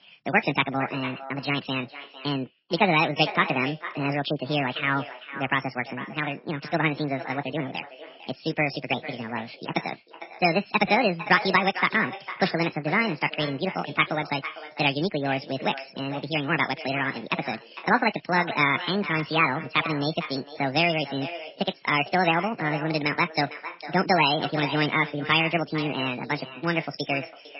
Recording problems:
garbled, watery; badly; nothing above 5.5 kHz
wrong speed and pitch; too fast and too high; 1.7 times normal speed
echo of what is said; noticeable; throughout; 450 ms later, 15 dB below the speech

